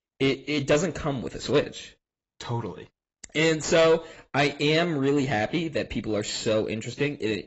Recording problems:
garbled, watery; badly; nothing above 7.5 kHz
distortion; slight; 10 dB below the speech

